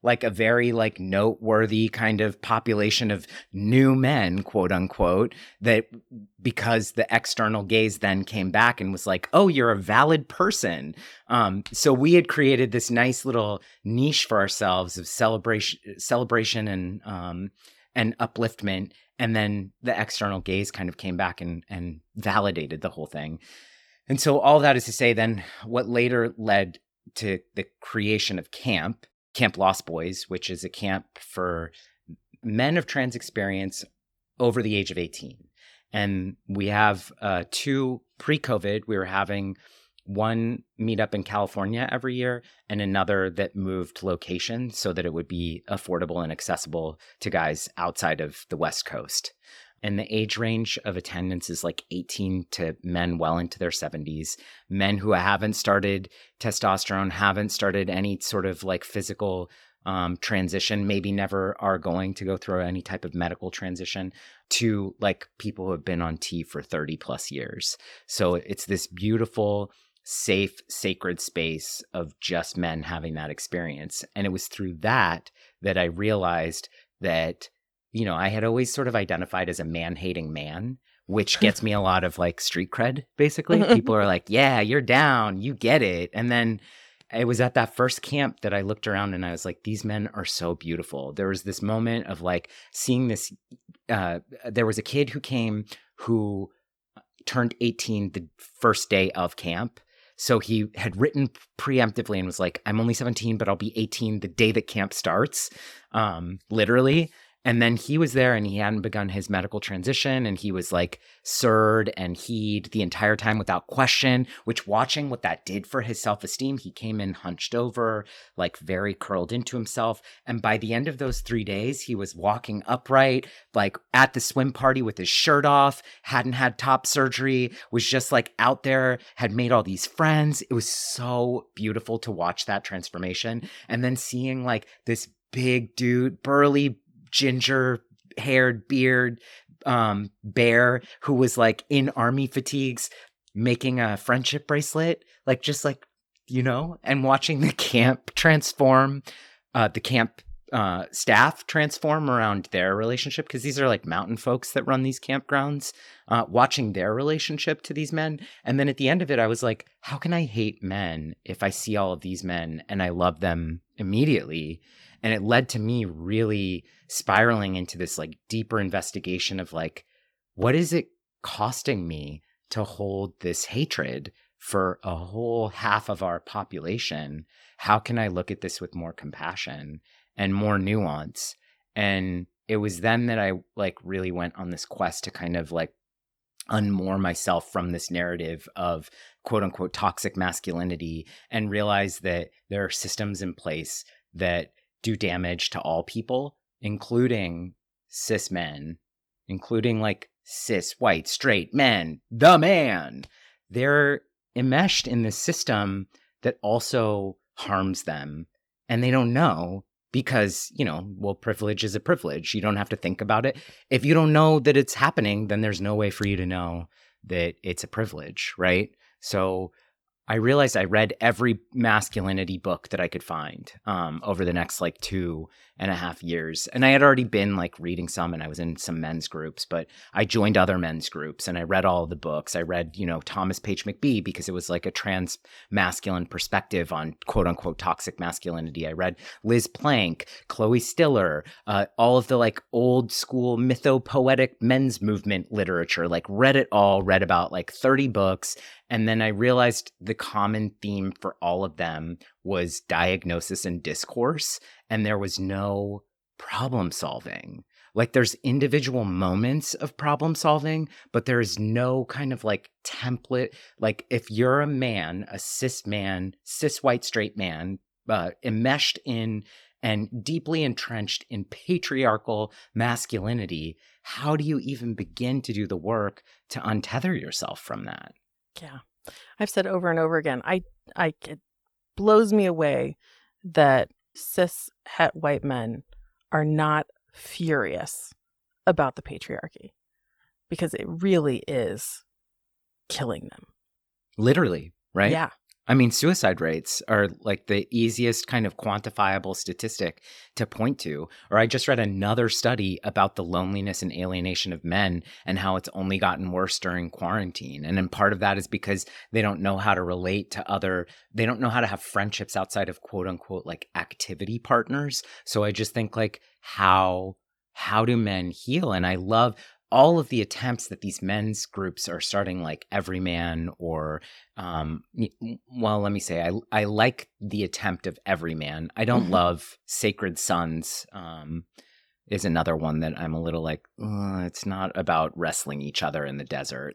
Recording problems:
none

